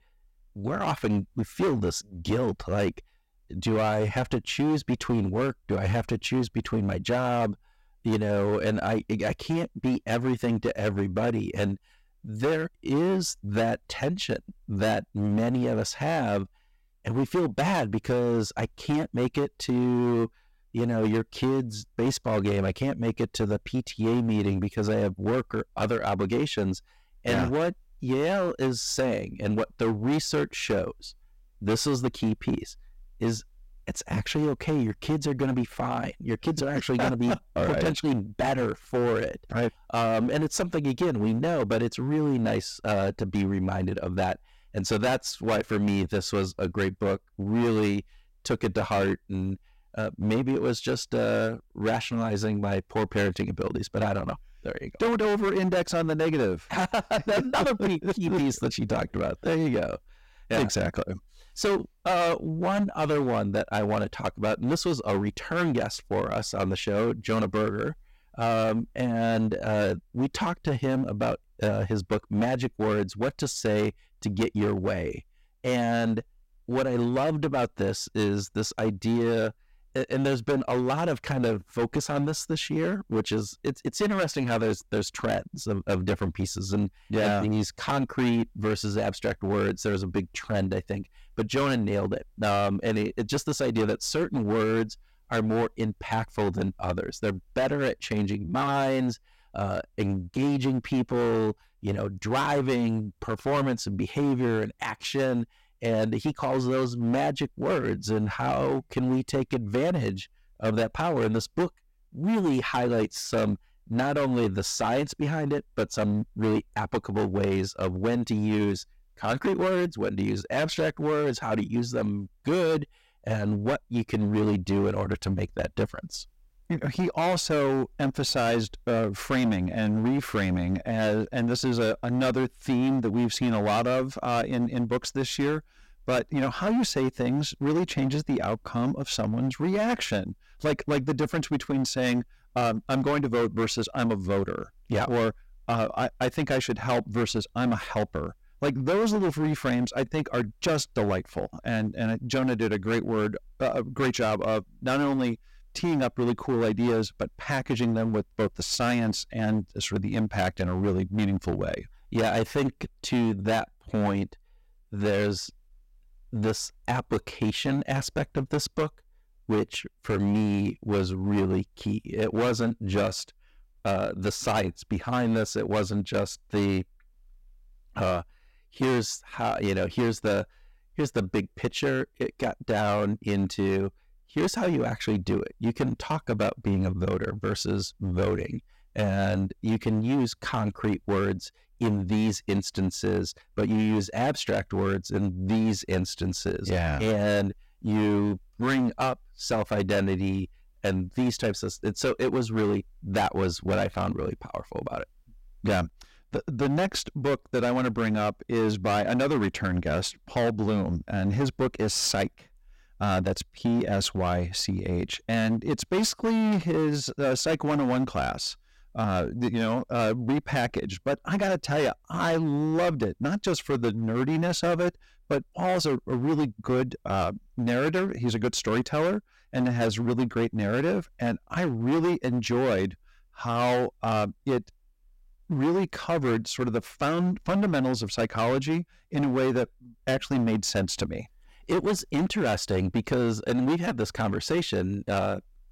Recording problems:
distortion; heavy; 14% of the sound clipped

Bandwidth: 16 kHz